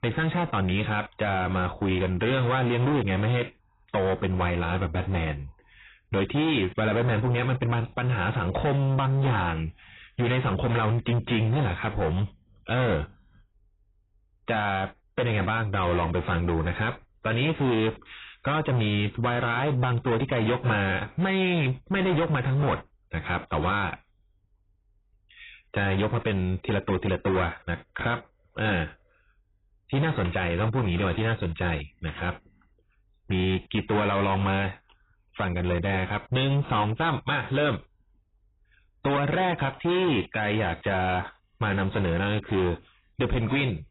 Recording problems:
distortion; heavy; 17% of the sound clipped
garbled, watery; badly; nothing above 4 kHz

